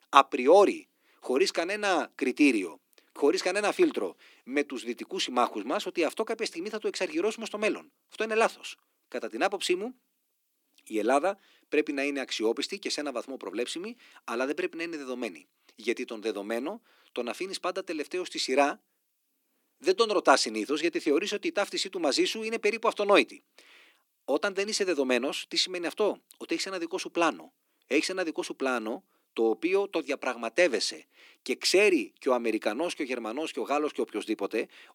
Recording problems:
thin; somewhat; fading below 300 Hz

